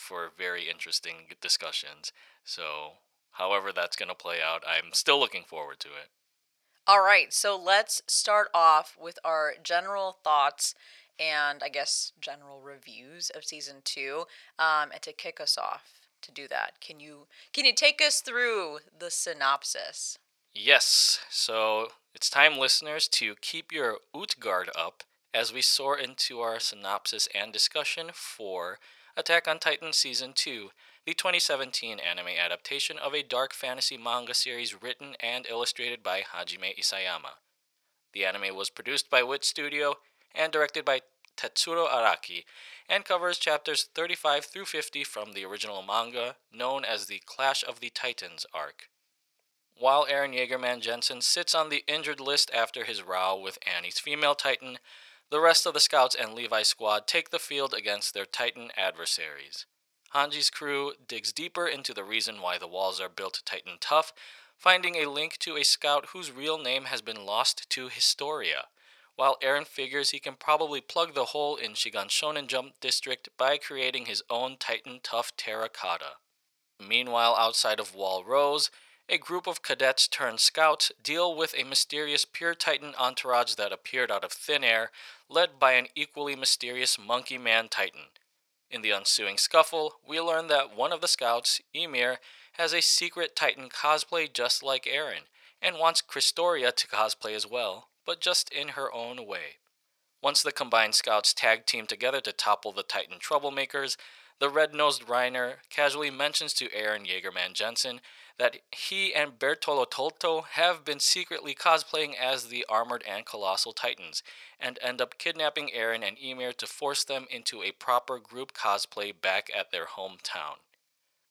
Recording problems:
thin; very; fading below 800 Hz

